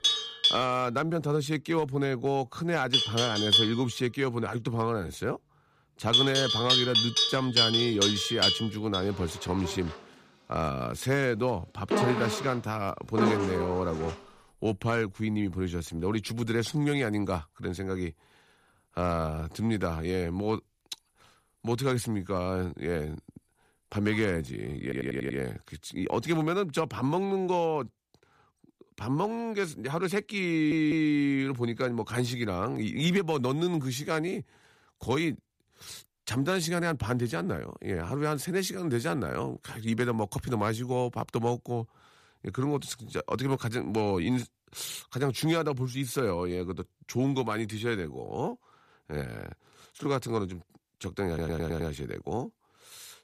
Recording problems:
animal sounds; very loud; until 24 s; 4 dB above the speech
audio stuttering; at 25 s, at 31 s and at 51 s

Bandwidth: 14.5 kHz